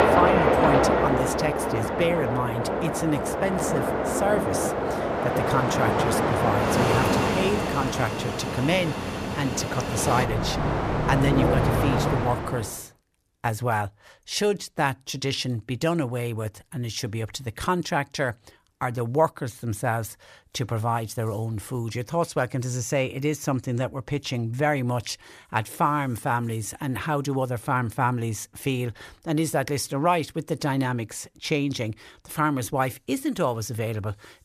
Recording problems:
train or aircraft noise; very loud; until 12 s; 2 dB above the speech

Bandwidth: 14.5 kHz